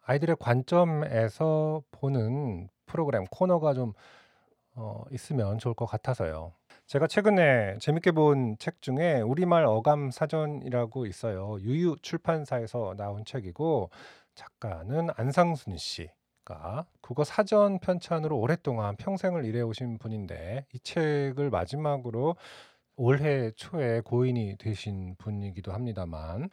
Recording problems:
none

